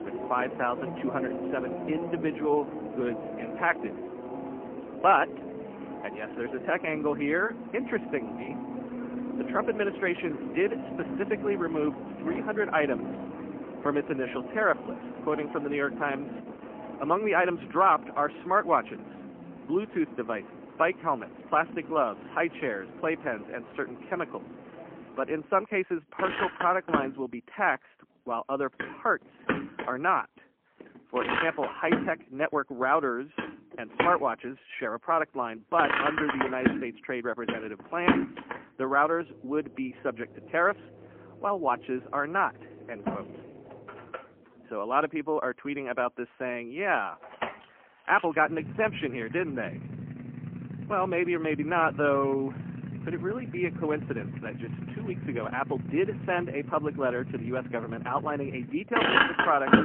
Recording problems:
phone-call audio; poor line
traffic noise; loud; throughout; 6 dB below the speech

